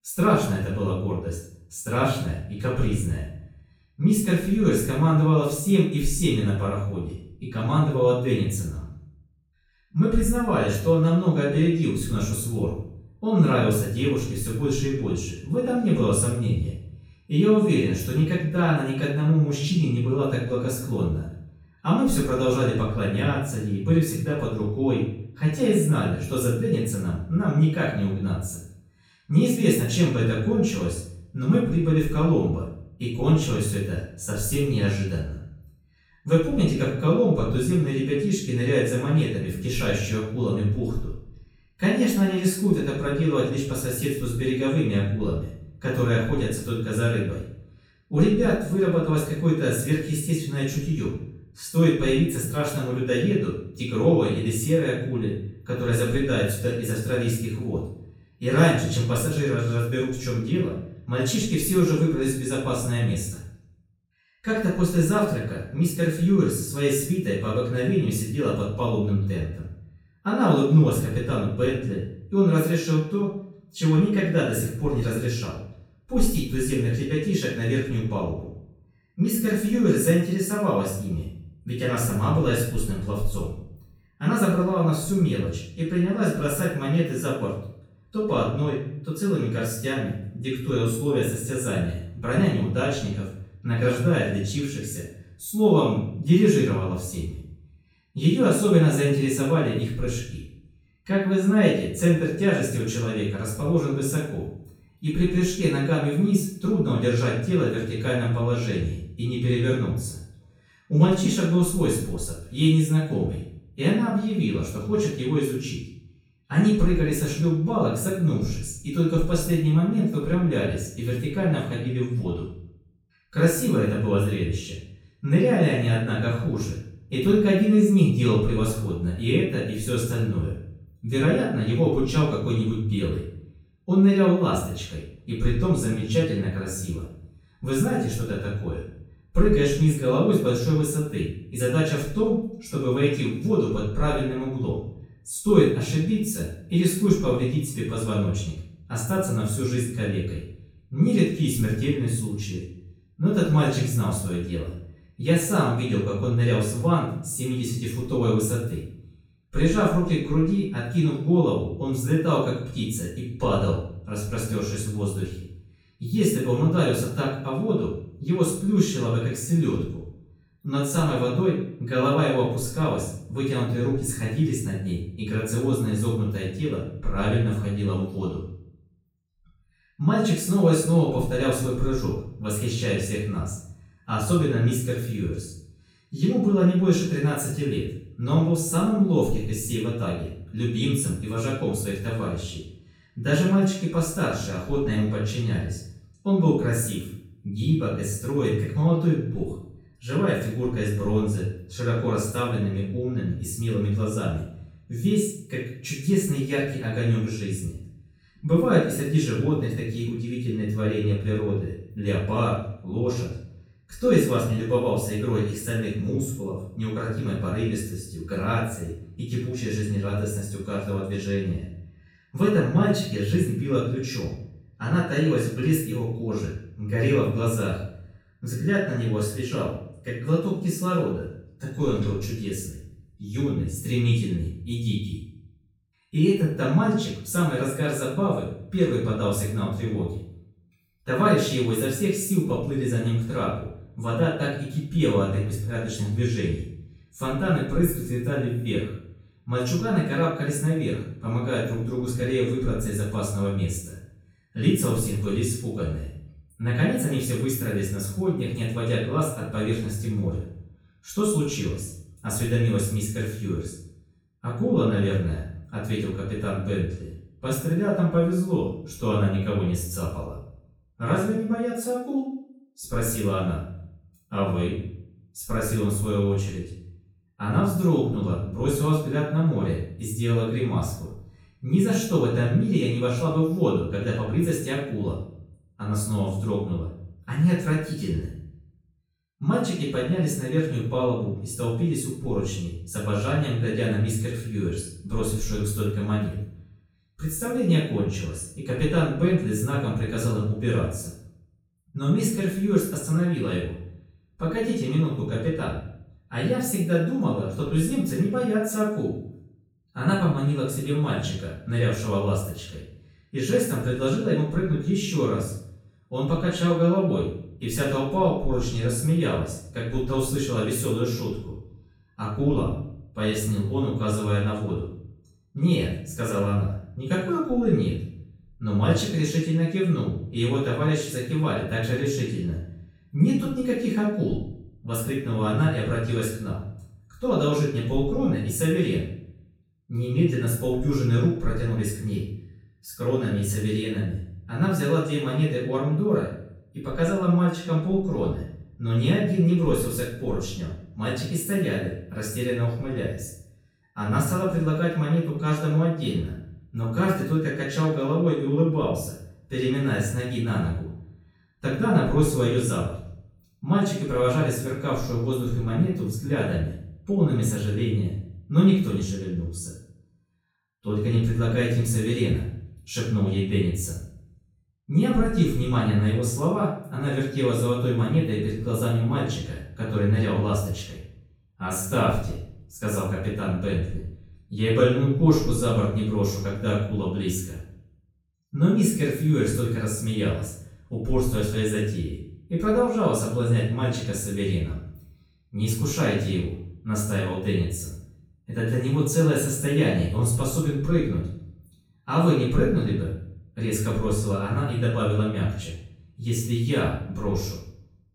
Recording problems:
off-mic speech; far
room echo; noticeable; dies away in 0.6 s

